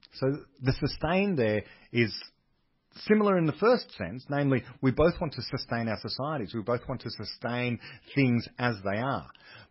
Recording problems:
garbled, watery; badly; nothing above 5.5 kHz

